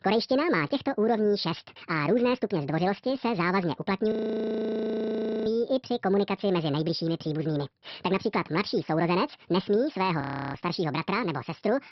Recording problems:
wrong speed and pitch; too fast and too high; 1.7 times normal speed
high frequencies cut off; noticeable; nothing above 5.5 kHz
audio freezing; at 4 s for 1.5 s and at 10 s

